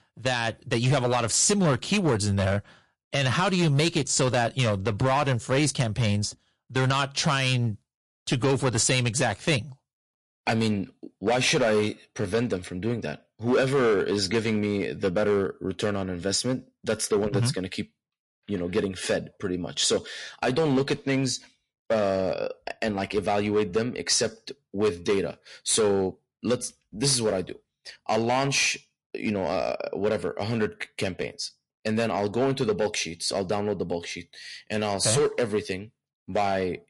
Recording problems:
distortion; slight; 6% of the sound clipped
garbled, watery; slightly; nothing above 11 kHz

